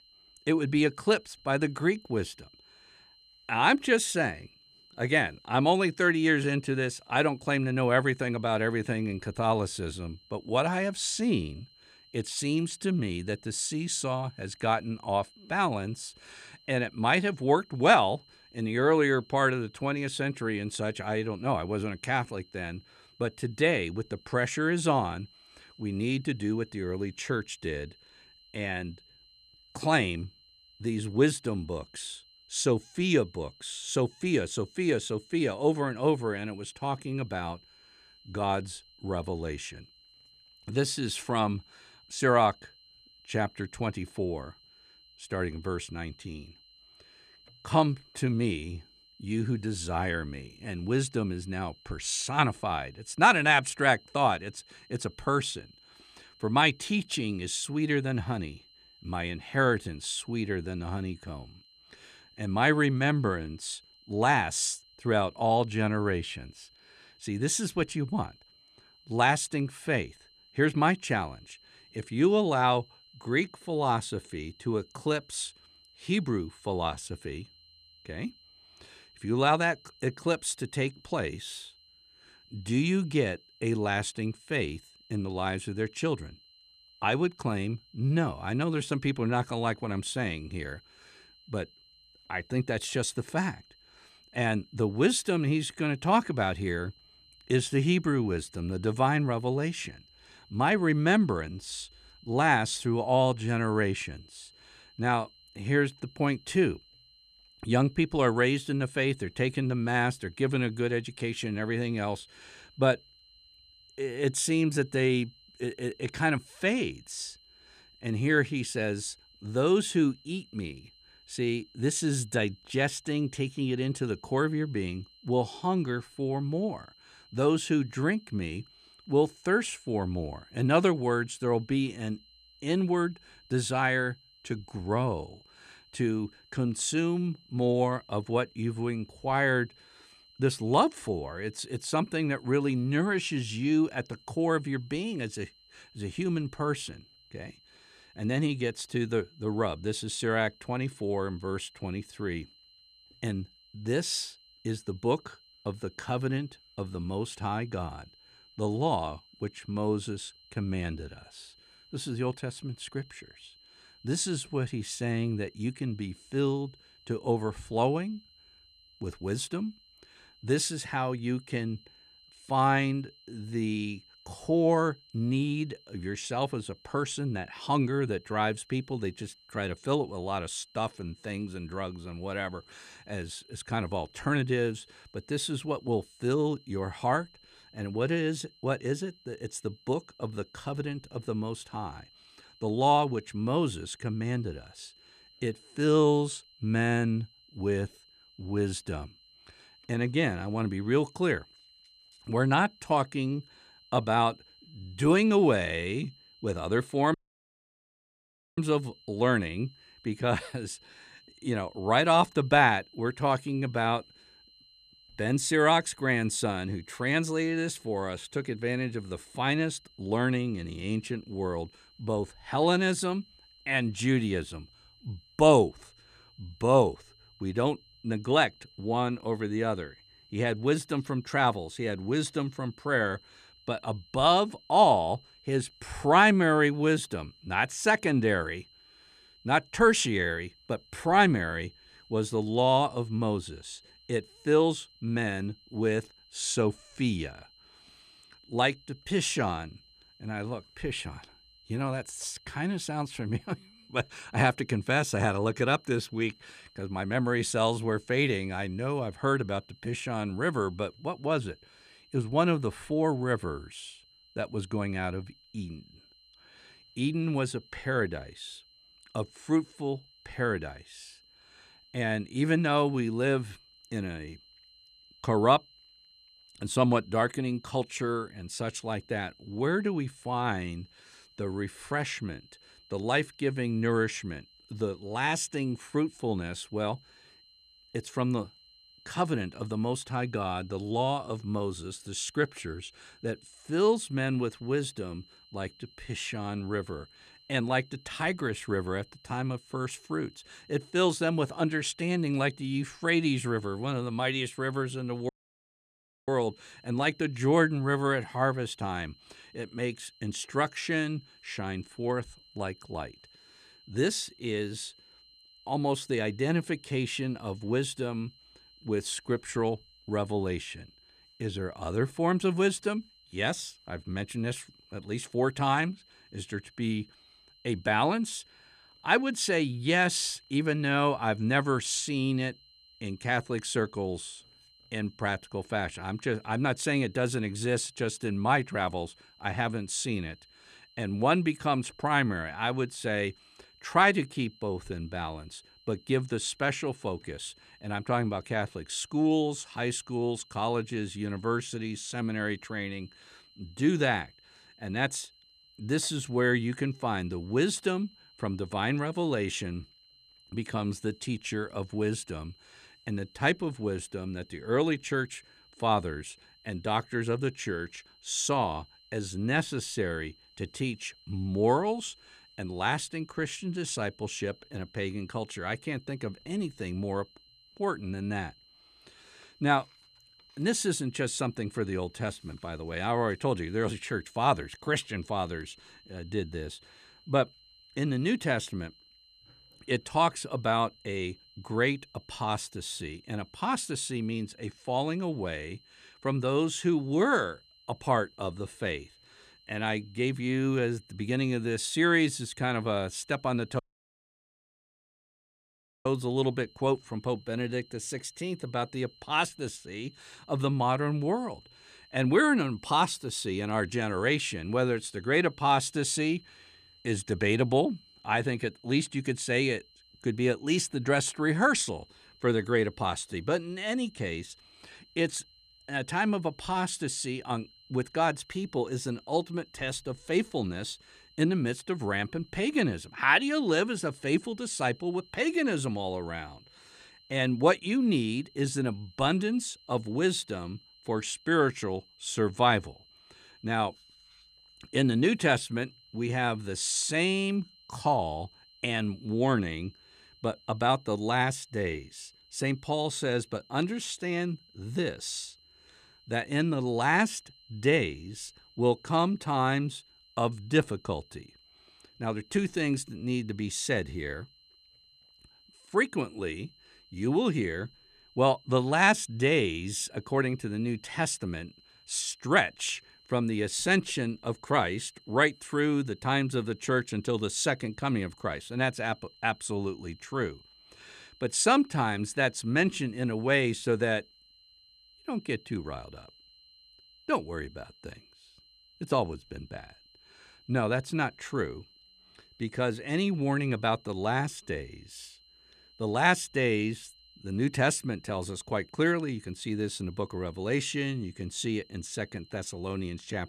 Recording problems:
high-pitched whine; faint; throughout; 4 kHz, 25 dB below the speech
audio cutting out; at 3:27 for 1.5 s, at 5:05 for 1 s and at 6:44 for 2.5 s

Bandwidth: 14.5 kHz